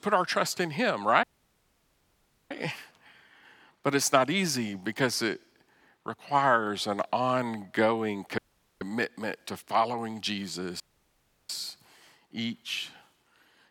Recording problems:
audio cutting out; at 1 s for 1.5 s, at 8.5 s and at 11 s for 0.5 s

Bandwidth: 18.5 kHz